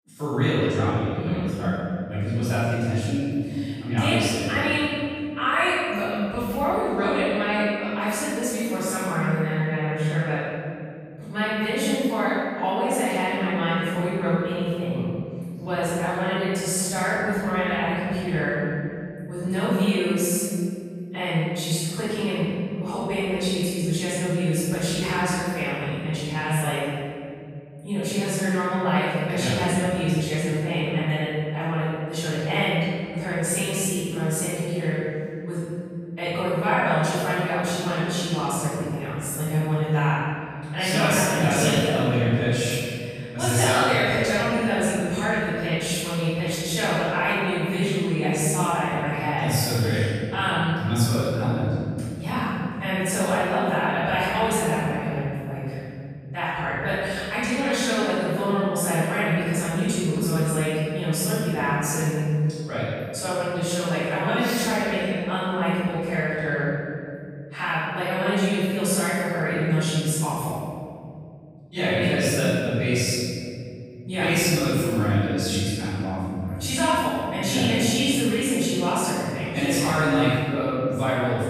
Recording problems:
room echo; strong; dies away in 2.5 s
off-mic speech; far

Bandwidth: 15 kHz